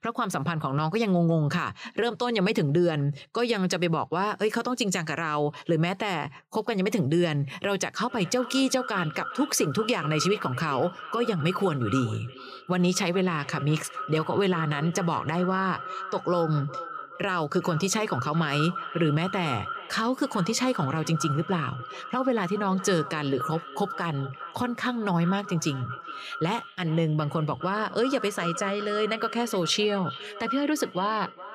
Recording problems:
echo of what is said; strong; from 8 s on; 410 ms later, 10 dB below the speech

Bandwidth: 15 kHz